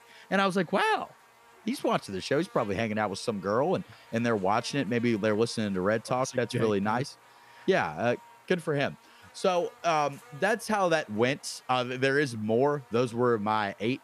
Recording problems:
electrical hum; faint; throughout; 60 Hz, 25 dB below the speech

